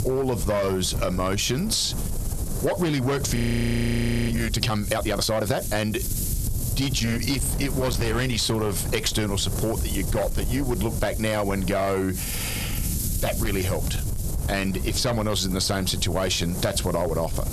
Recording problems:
distortion; slight; 6% of the sound clipped
squashed, flat; somewhat
wind noise on the microphone; occasional gusts; 10 dB below the speech
audio freezing; at 3.5 s for 1 s

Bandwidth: 13.5 kHz